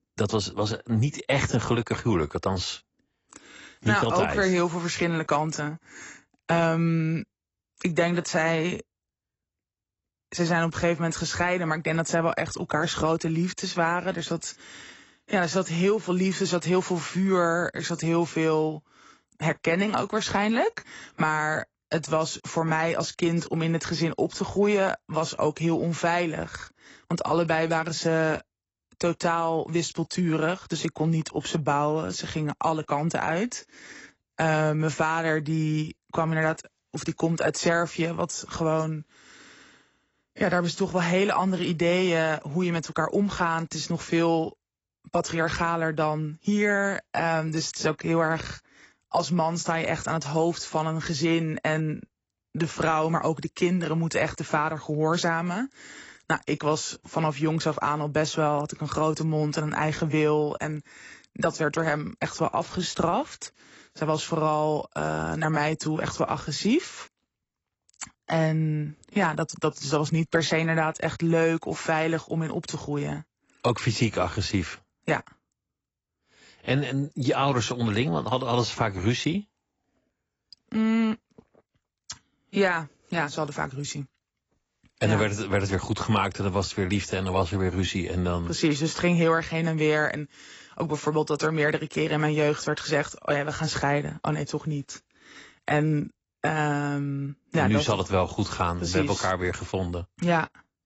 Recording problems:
garbled, watery; badly; nothing above 8 kHz

